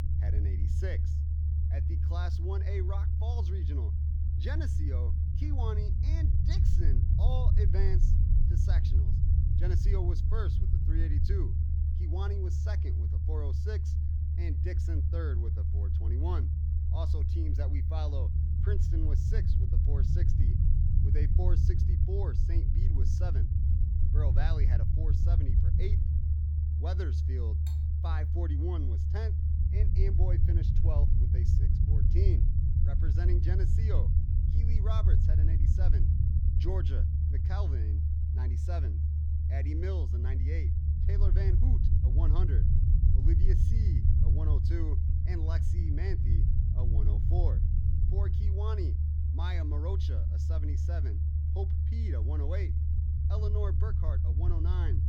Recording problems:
low rumble; loud; throughout; as loud as the speech
clattering dishes; faint; at 28 s; peak 10 dB below the speech

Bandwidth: 18 kHz